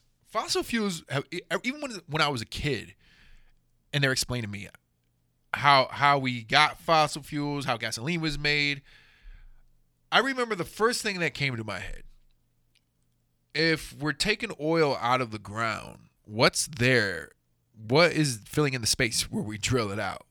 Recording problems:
uneven, jittery; strongly; from 1 to 19 s

